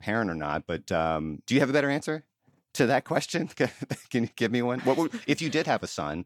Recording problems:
none

